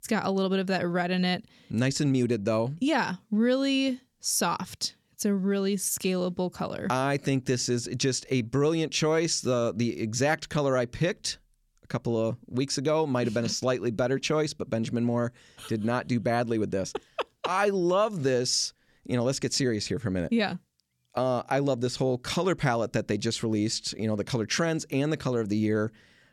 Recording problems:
none

